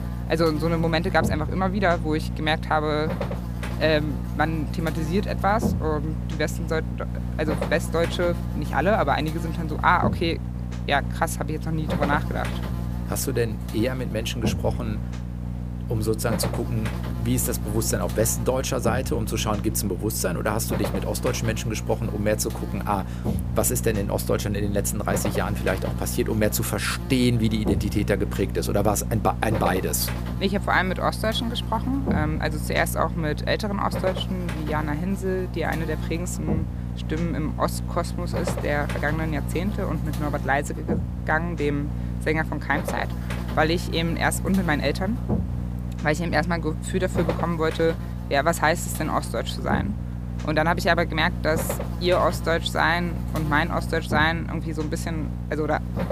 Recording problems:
electrical hum; noticeable; throughout; 60 Hz, 10 dB below the speech

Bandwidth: 15 kHz